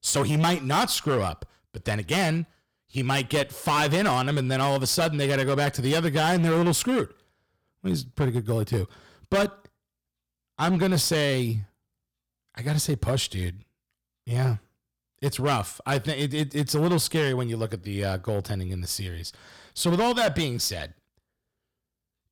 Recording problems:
distortion; heavy; 9% of the sound clipped

